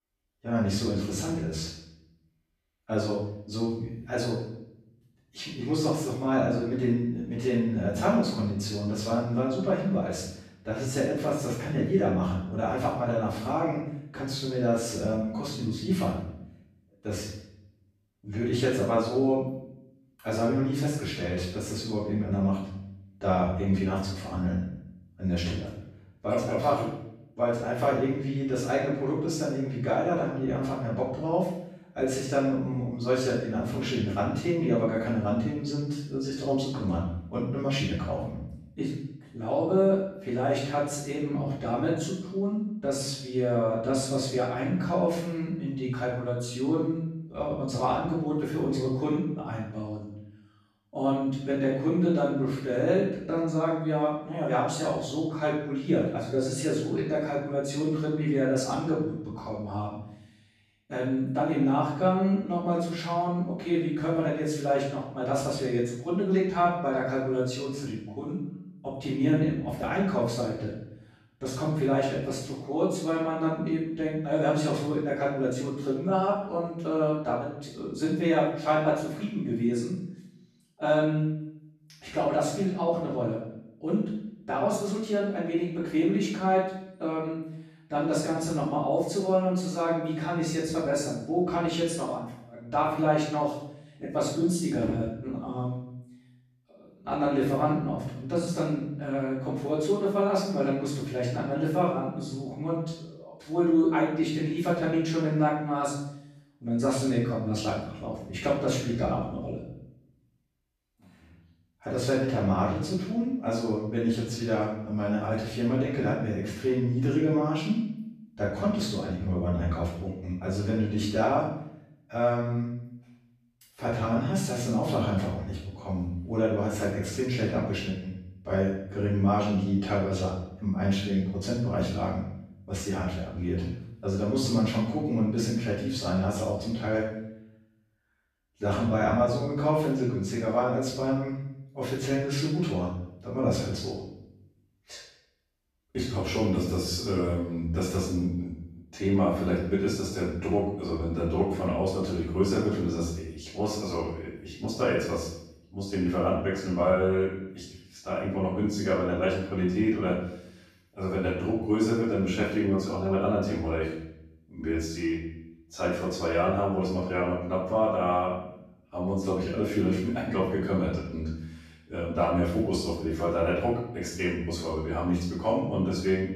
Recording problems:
off-mic speech; far
room echo; noticeable; dies away in 0.7 s

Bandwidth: 14.5 kHz